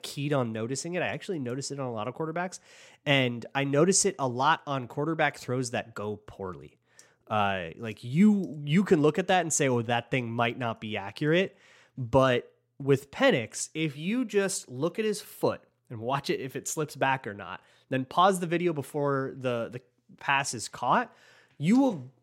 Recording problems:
none

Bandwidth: 16 kHz